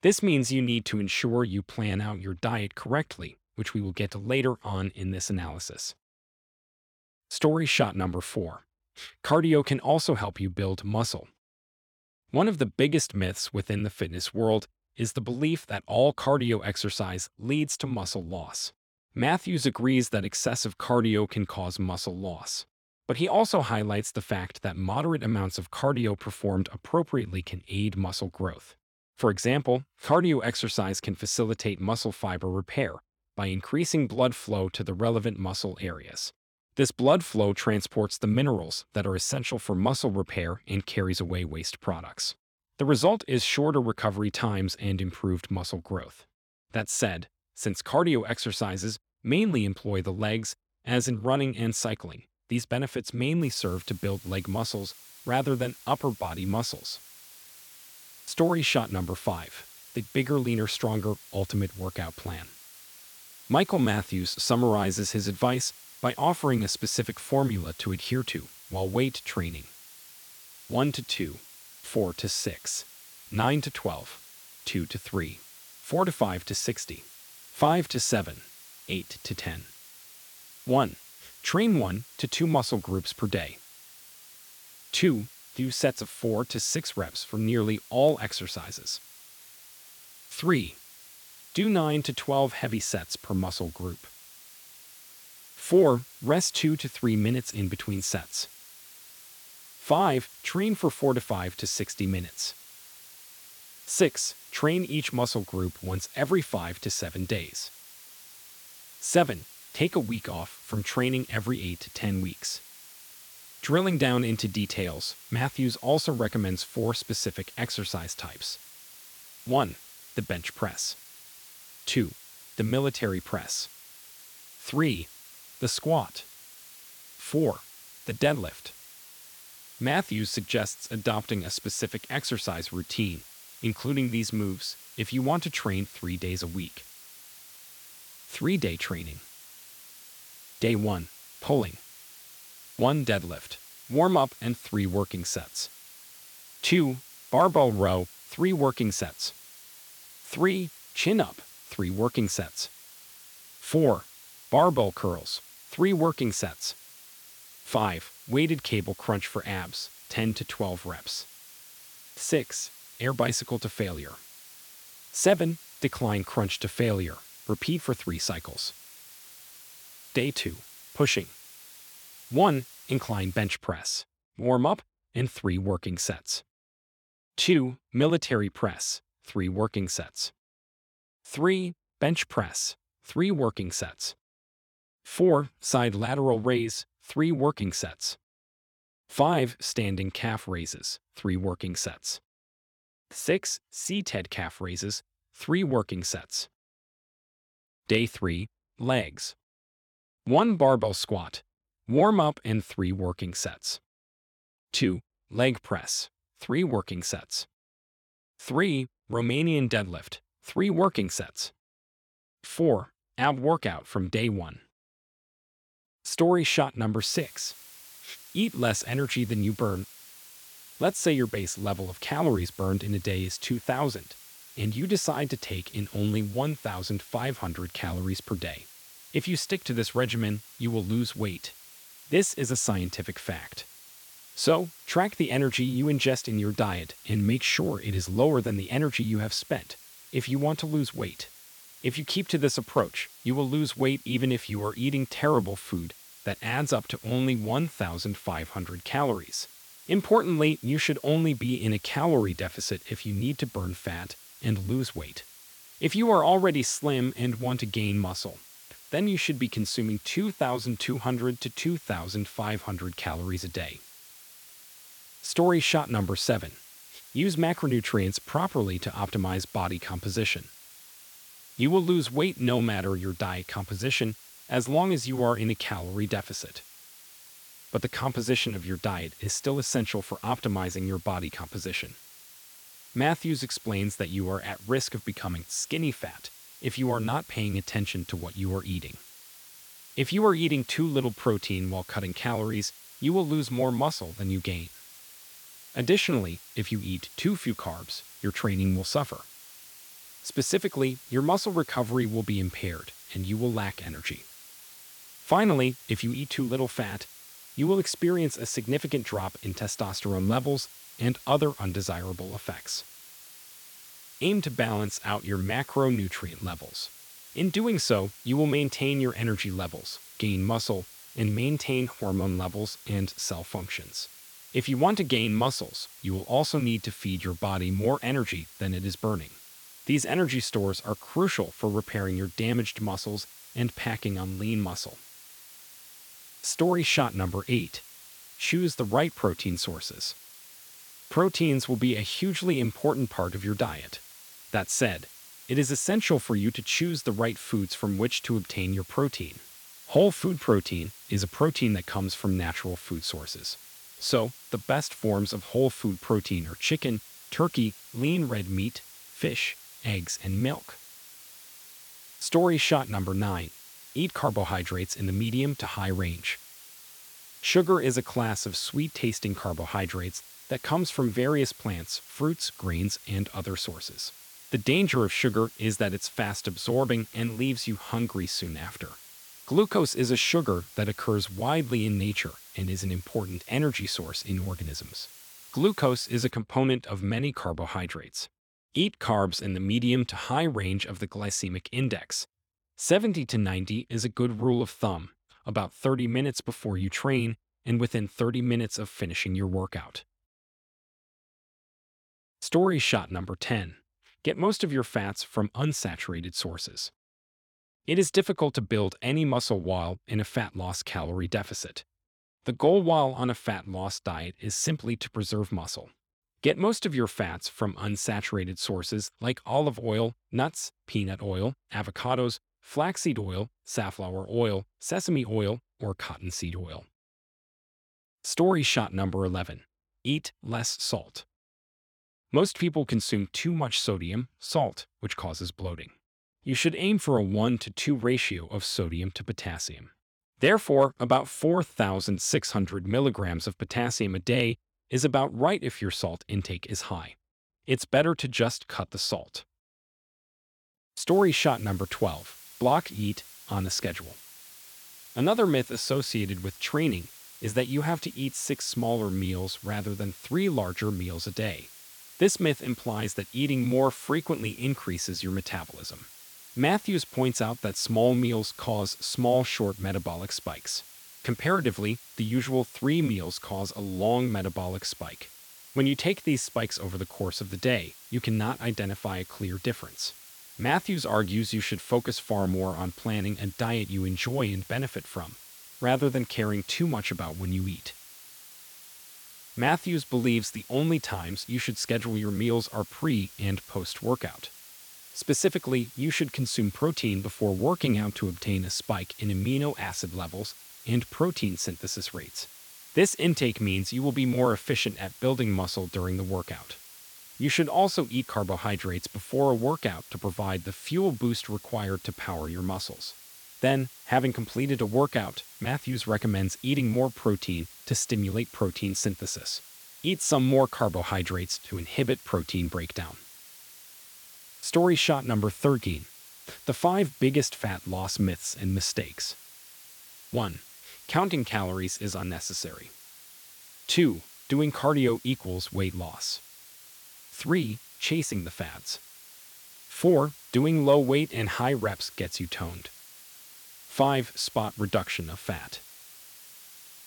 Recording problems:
hiss; noticeable; from 53 s to 2:53, from 3:37 to 6:26 and from 7:31 on; 20 dB below the speech

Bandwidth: 18.5 kHz